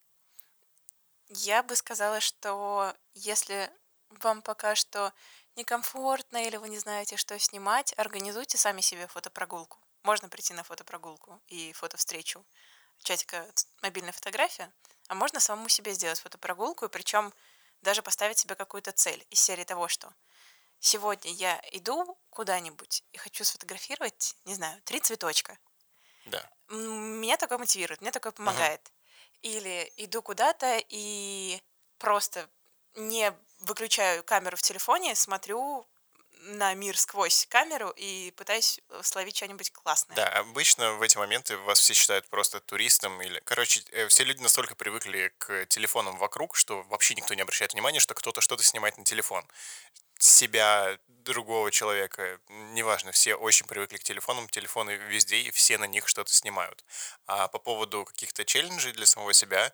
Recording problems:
thin; very; fading below 850 Hz

